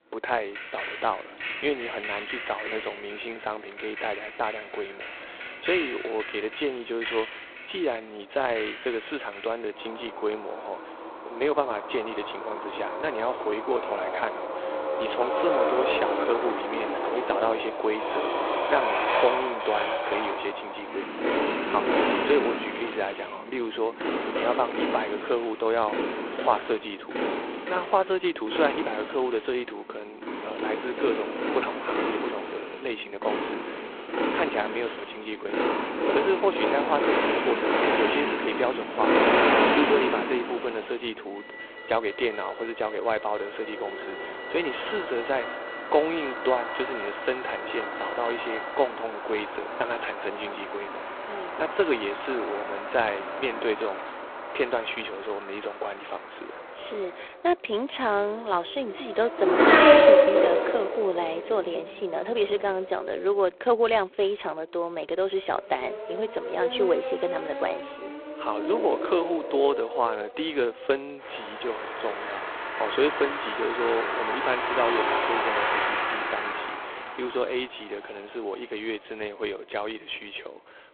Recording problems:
phone-call audio; poor line
traffic noise; very loud; throughout; 1 dB above the speech

